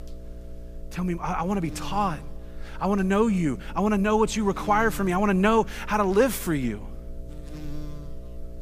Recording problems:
electrical hum; faint; throughout; 60 Hz, 25 dB below the speech

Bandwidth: 15 kHz